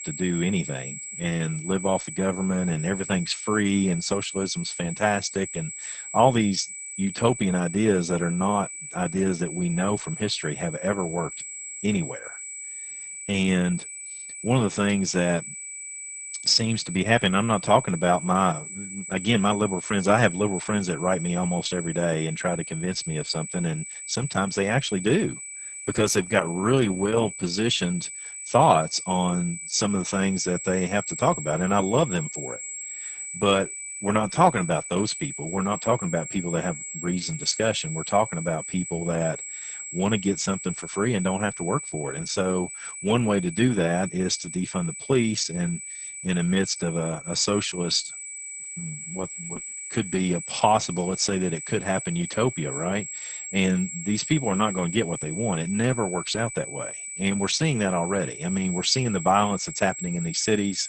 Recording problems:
garbled, watery; badly; nothing above 8 kHz
high-pitched whine; loud; throughout; 8 kHz, 8 dB below the speech

